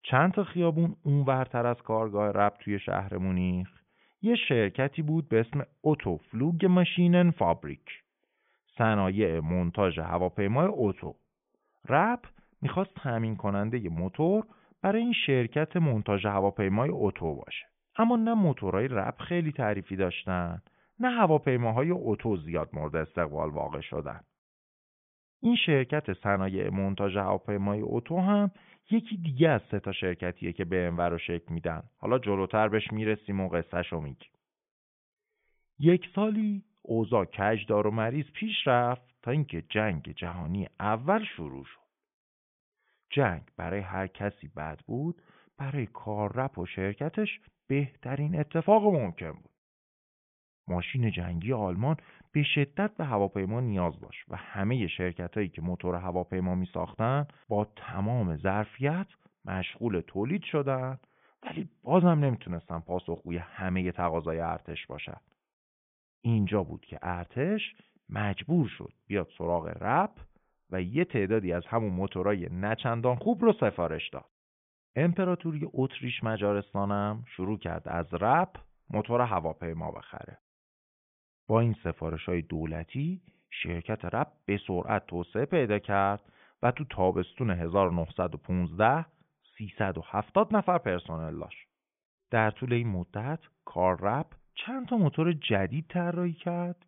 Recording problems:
high frequencies cut off; severe; nothing above 3.5 kHz

